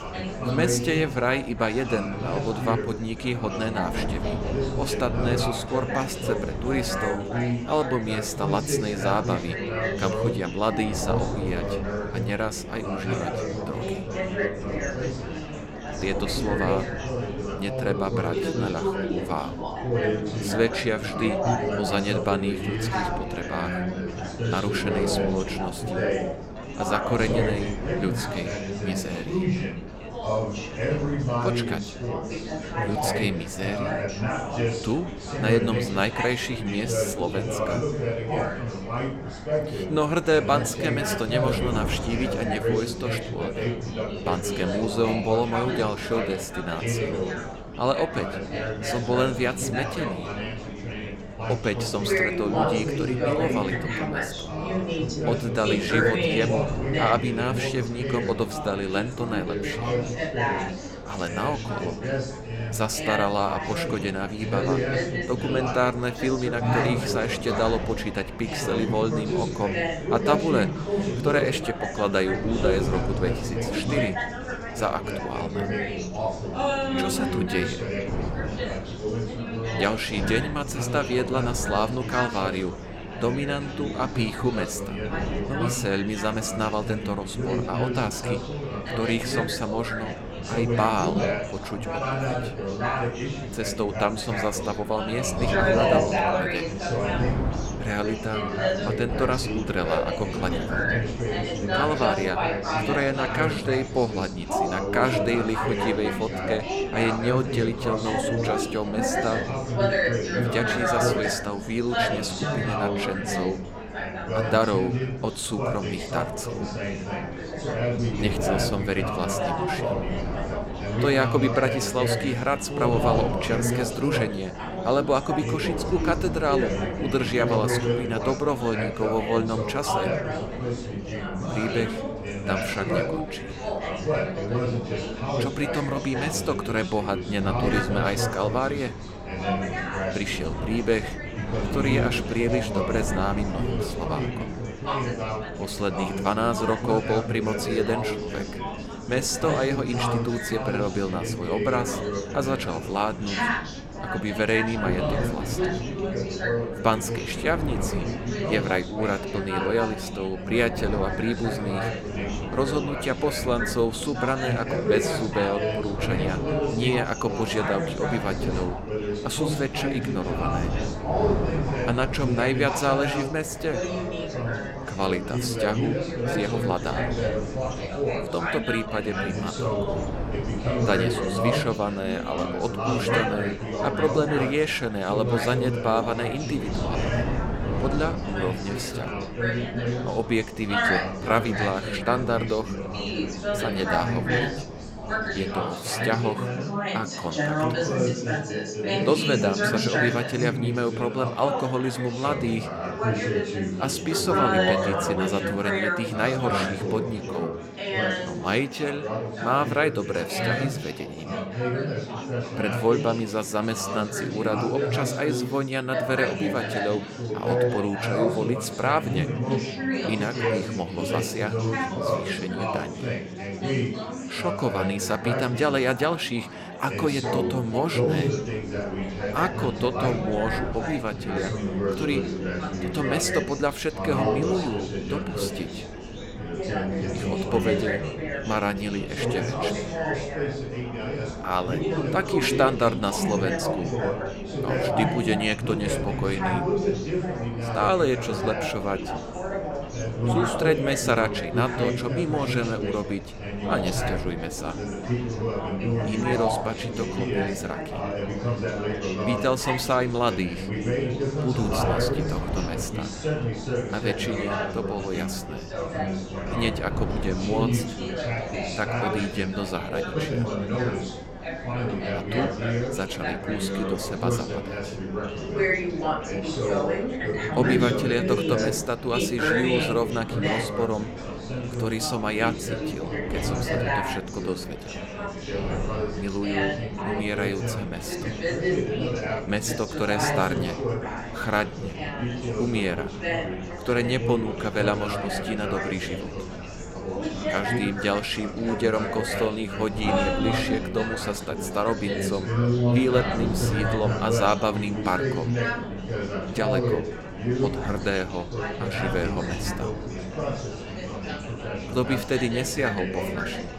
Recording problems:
chatter from many people; loud; throughout; 1 dB below the speech
wind noise on the microphone; occasional gusts; until 3:16 and from 3:48 on; 15 dB below the speech

